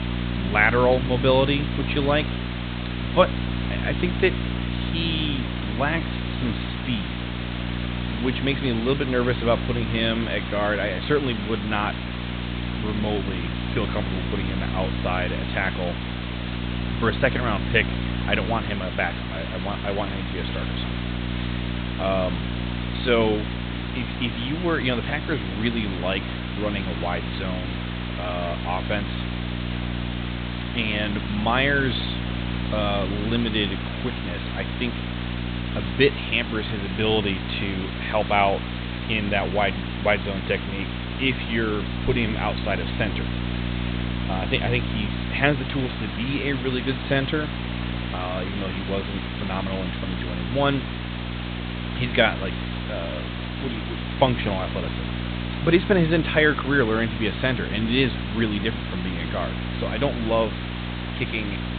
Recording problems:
high frequencies cut off; severe; nothing above 4 kHz
hiss; loud; throughout; 9 dB below the speech
electrical hum; noticeable; throughout; 60 Hz, 15 dB below the speech

